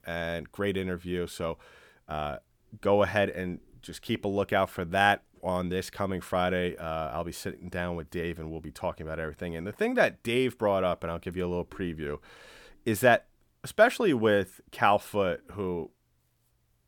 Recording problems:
none

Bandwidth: 18.5 kHz